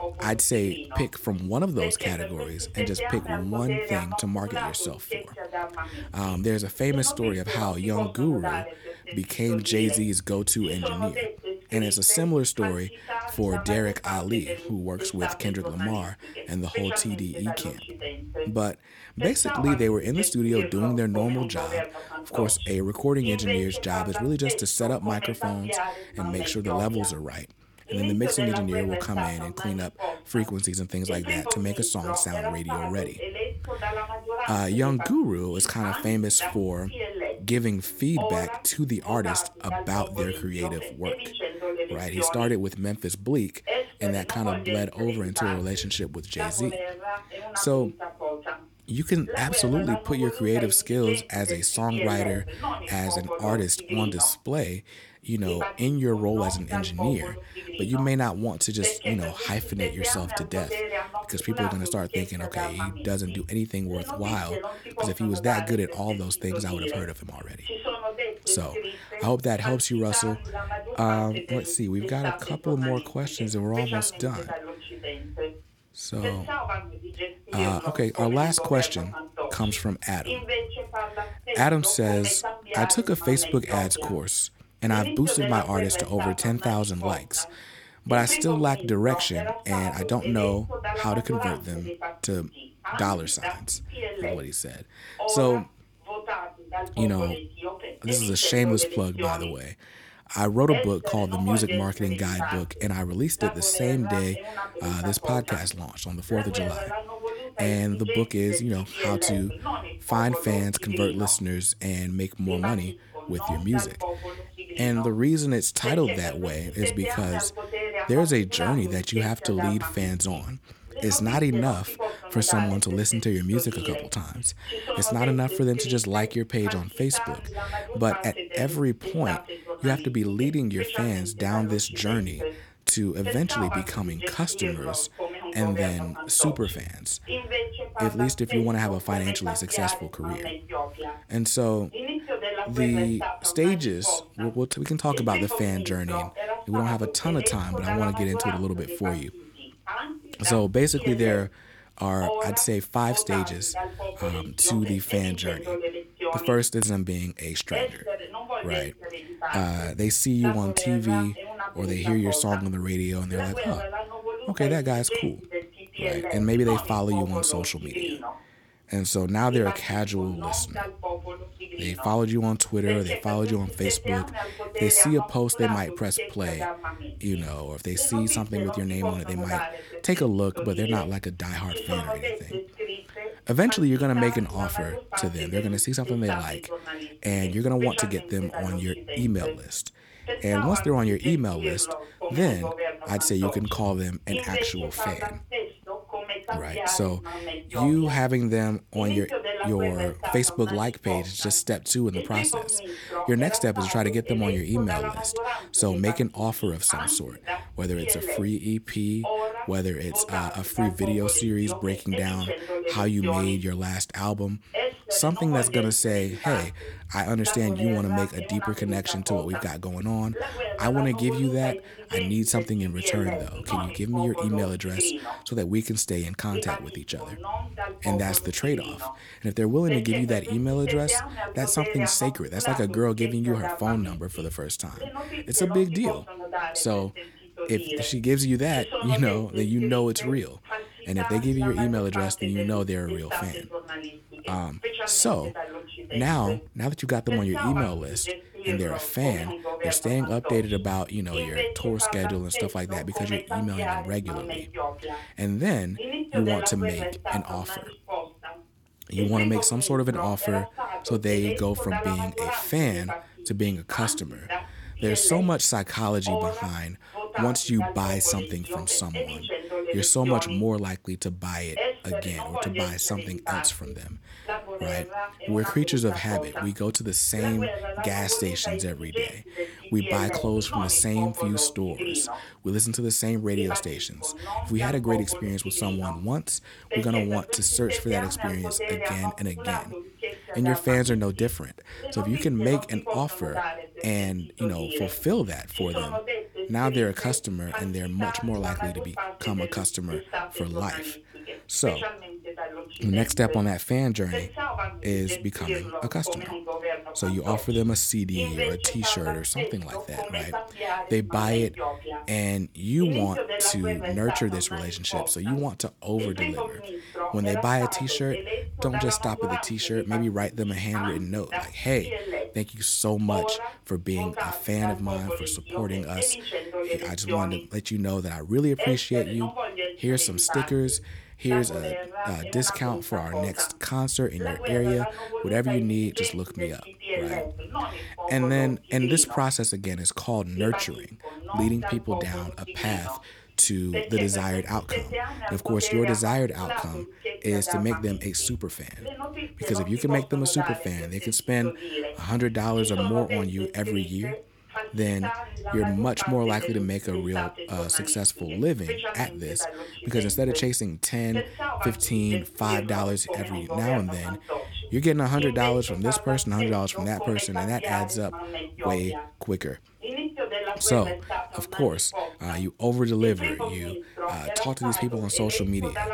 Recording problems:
voice in the background; loud; throughout; 7 dB below the speech

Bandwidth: 18.5 kHz